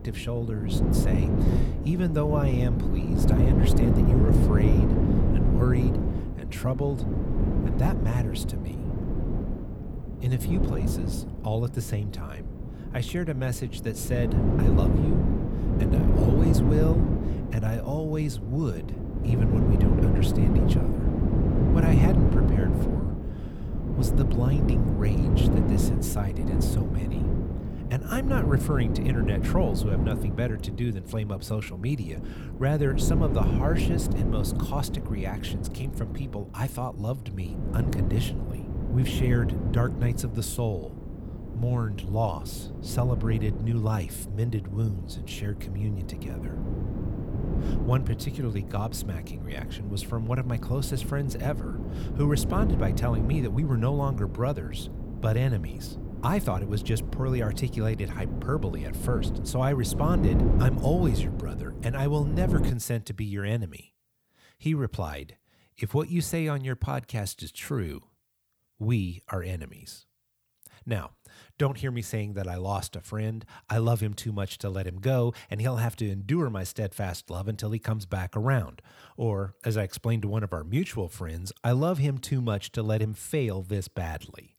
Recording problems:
wind noise on the microphone; heavy; until 1:03; 1 dB below the speech

